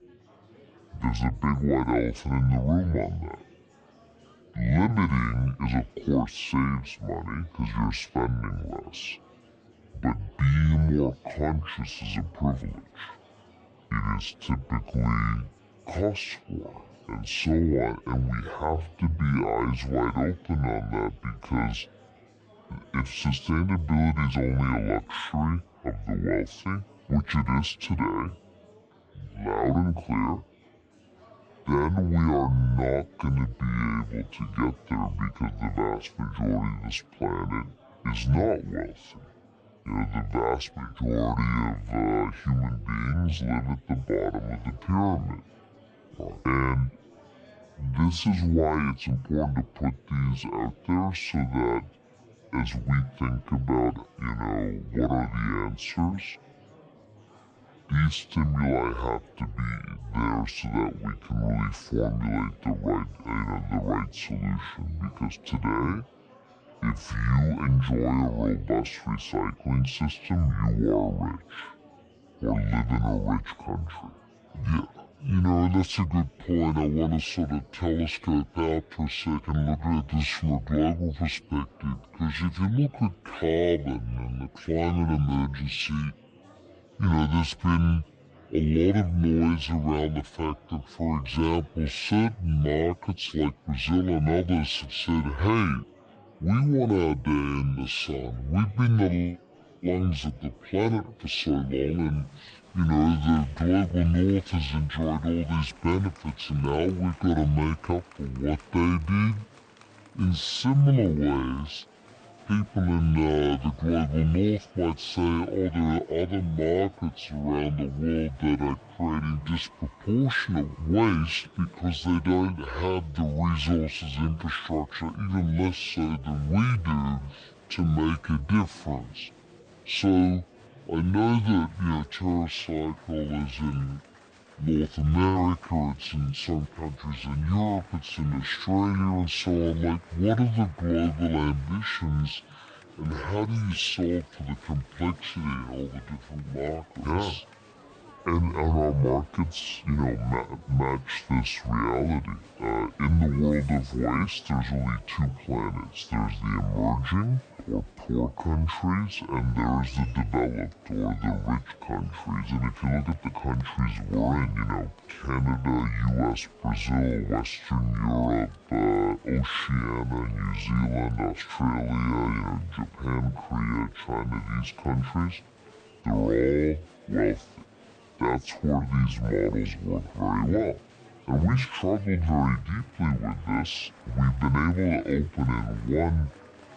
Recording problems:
wrong speed and pitch; too slow and too low; 0.6 times normal speed
murmuring crowd; faint; throughout; 25 dB below the speech

